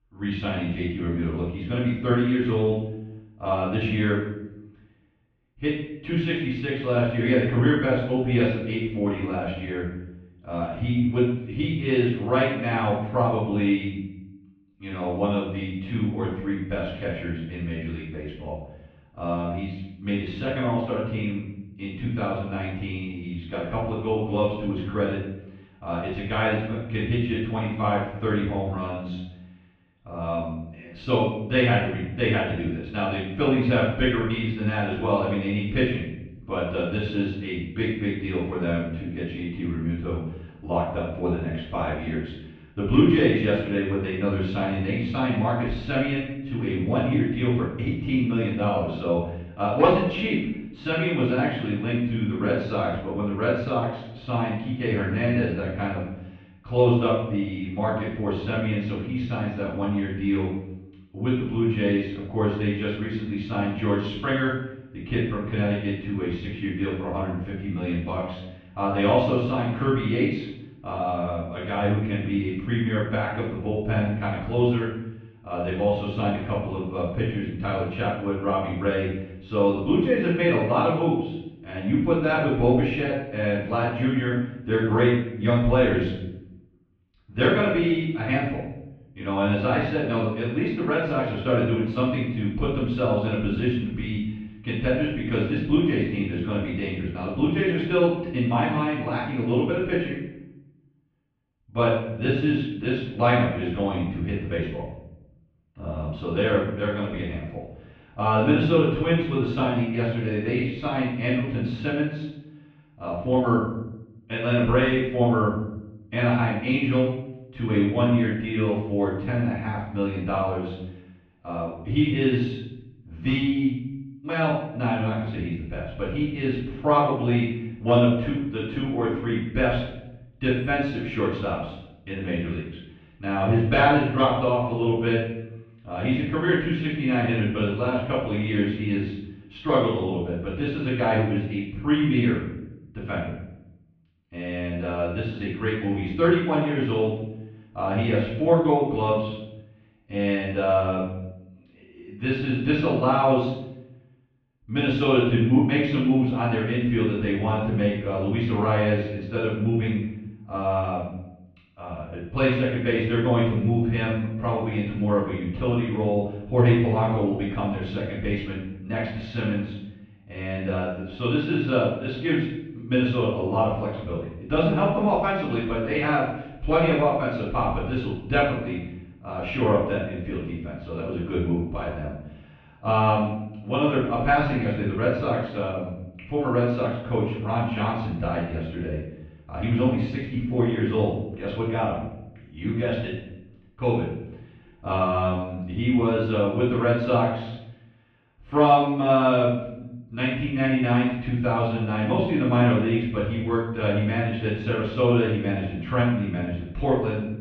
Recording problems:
off-mic speech; far
muffled; very; fading above 3 kHz
room echo; noticeable; dies away in 0.7 s

